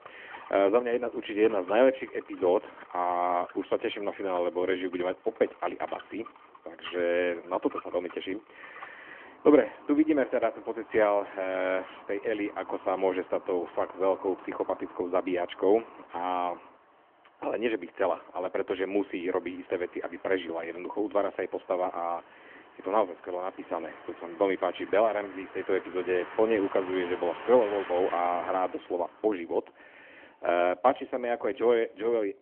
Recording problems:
phone-call audio; nothing above 3 kHz
traffic noise; noticeable; throughout; 20 dB below the speech

